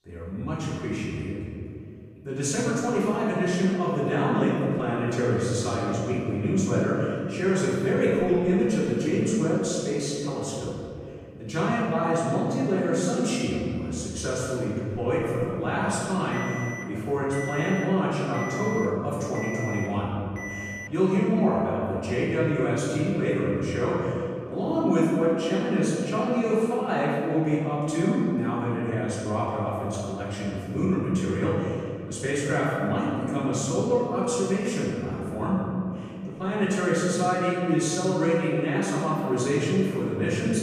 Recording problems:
room echo; strong; dies away in 2.5 s
off-mic speech; far
alarm; noticeable; from 16 to 21 s; peak 8 dB below the speech

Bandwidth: 15 kHz